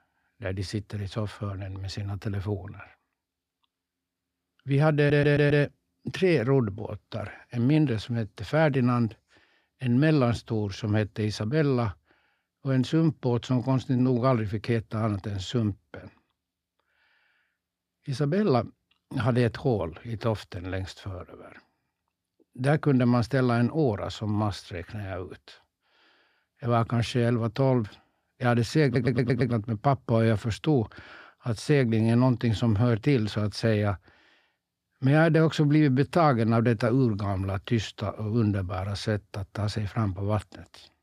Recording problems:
audio stuttering; at 5 s and at 29 s

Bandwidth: 14.5 kHz